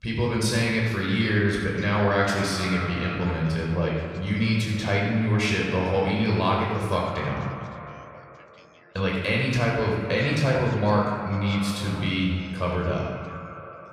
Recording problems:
off-mic speech; far
echo of what is said; noticeable; throughout; 240 ms later, 15 dB below the speech
room echo; noticeable; dies away in 1.3 s
voice in the background; faint; throughout; 25 dB below the speech

